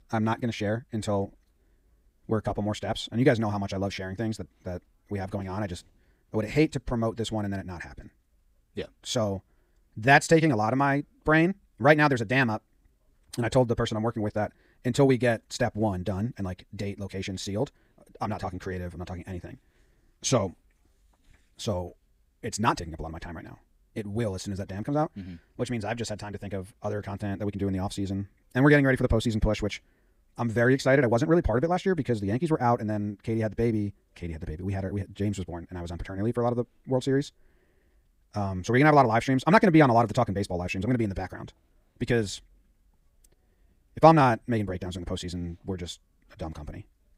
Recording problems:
wrong speed, natural pitch; too fast; 1.5 times normal speed

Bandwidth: 15.5 kHz